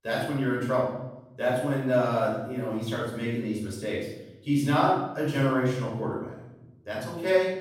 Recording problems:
off-mic speech; far
room echo; noticeable; dies away in 1 s

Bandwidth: 16 kHz